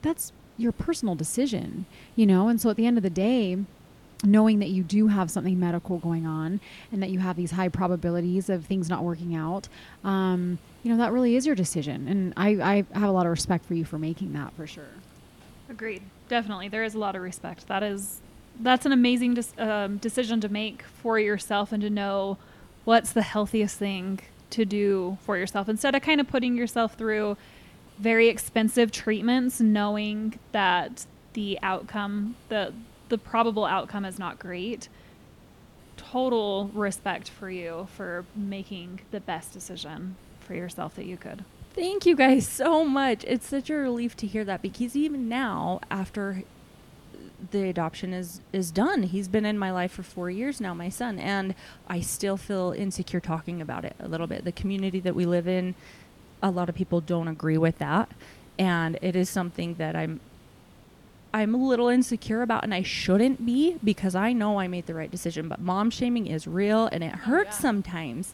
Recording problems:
hiss; faint; throughout; 25 dB below the speech

